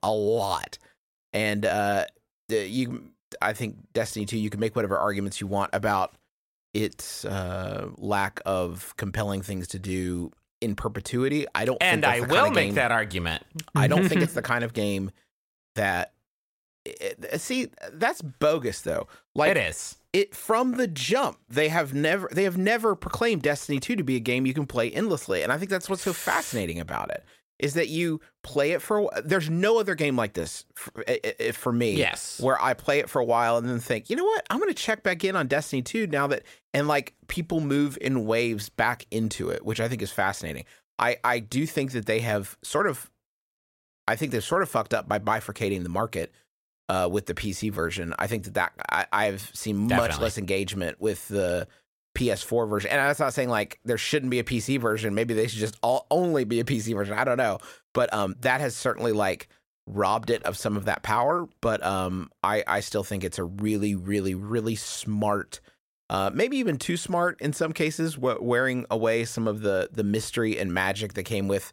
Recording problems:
uneven, jittery; strongly; from 1 to 58 s

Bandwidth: 16 kHz